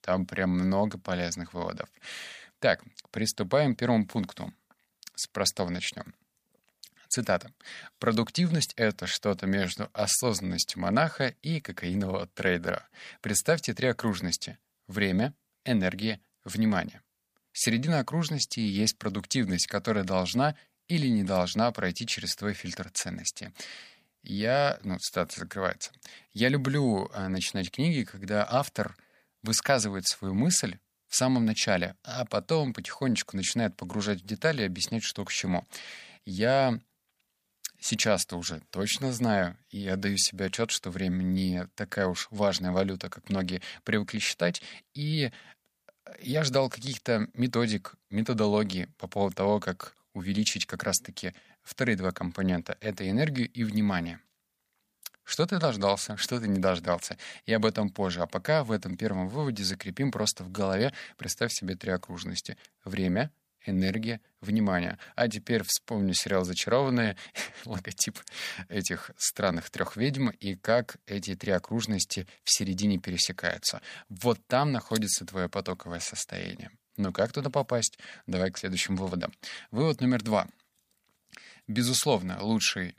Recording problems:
none

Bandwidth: 15 kHz